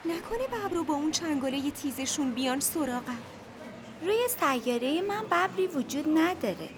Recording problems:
murmuring crowd; noticeable; throughout; 15 dB below the speech

